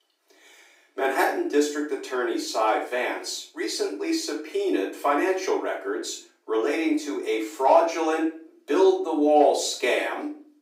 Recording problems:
off-mic speech; far
room echo; slight; dies away in 0.4 s
thin; very slightly; fading below 300 Hz

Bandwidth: 15.5 kHz